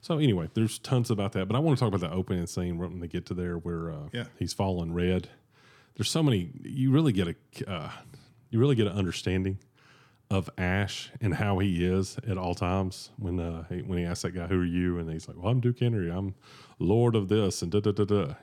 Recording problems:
none

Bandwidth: 17.5 kHz